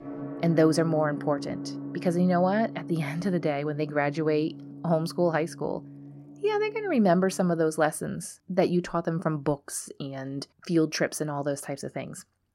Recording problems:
background music; noticeable; until 7.5 s; 10 dB below the speech

